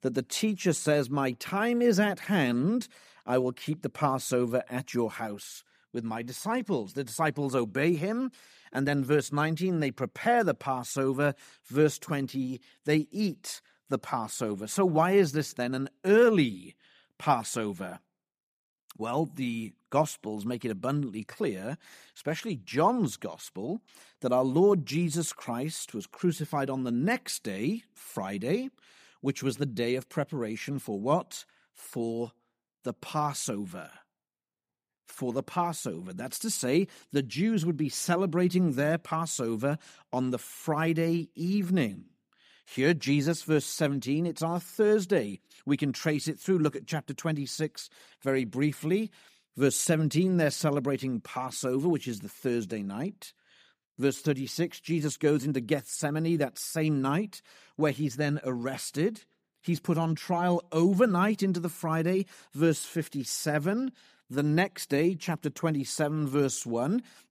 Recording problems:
none

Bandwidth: 15 kHz